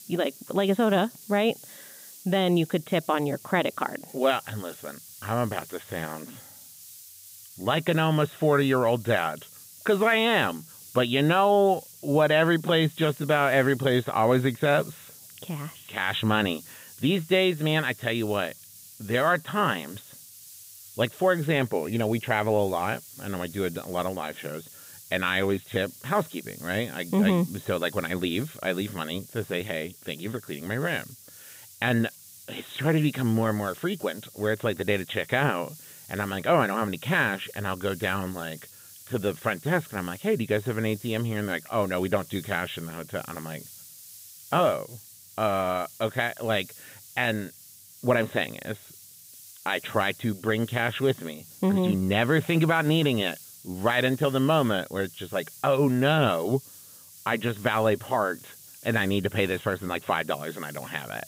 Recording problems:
high frequencies cut off; severe; nothing above 4 kHz
hiss; noticeable; throughout; 20 dB below the speech

